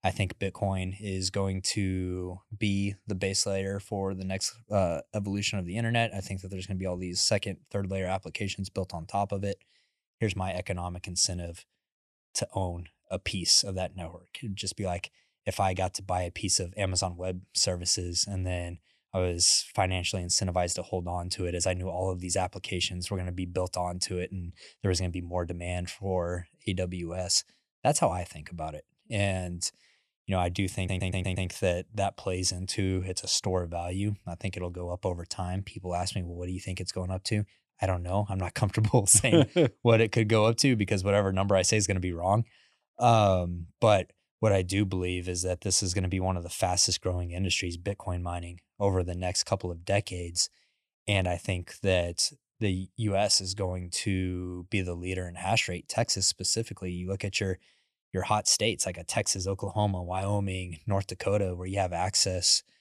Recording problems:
audio stuttering; at 31 s

